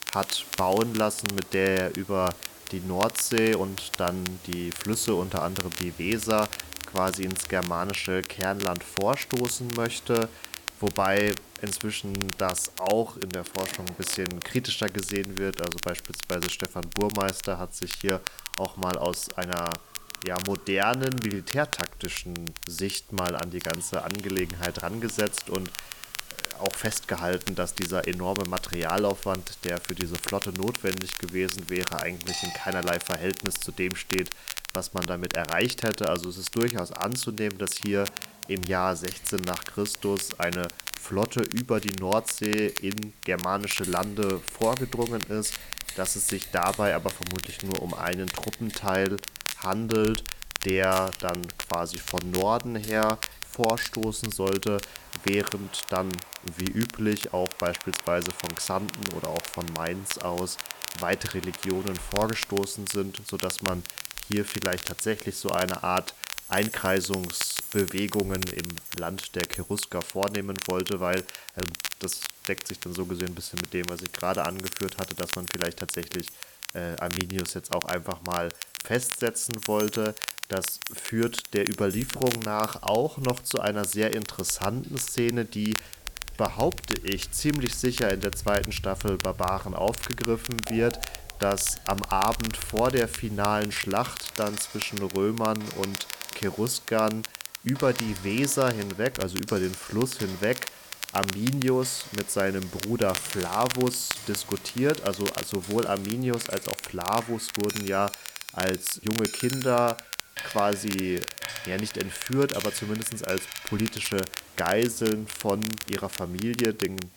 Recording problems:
crackle, like an old record; loud; 7 dB below the speech
household noises; noticeable; throughout; 15 dB below the speech
hiss; faint; throughout; 20 dB below the speech

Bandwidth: 18 kHz